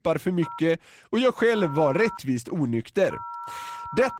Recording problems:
garbled, watery; slightly; nothing above 15.5 kHz
phone ringing; faint; peak 10 dB below the speech

